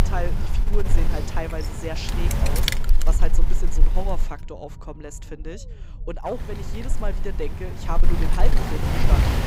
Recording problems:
wind noise on the microphone; heavy; until 4.5 s and from 6.5 s on; 1 dB above the speech
low rumble; noticeable; throughout; 20 dB below the speech

